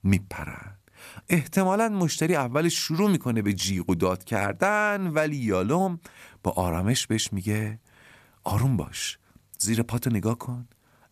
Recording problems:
none

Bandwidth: 14.5 kHz